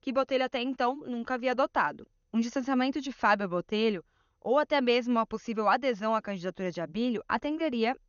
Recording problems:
garbled, watery; slightly; nothing above 6.5 kHz

